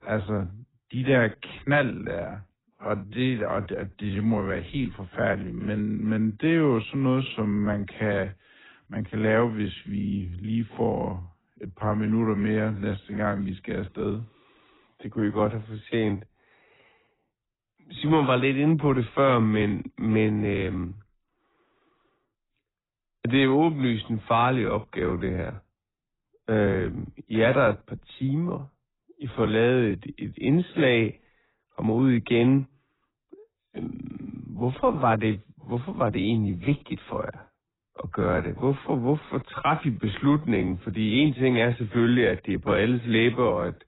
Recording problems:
garbled, watery; badly; nothing above 4 kHz
wrong speed, natural pitch; too slow; 0.7 times normal speed

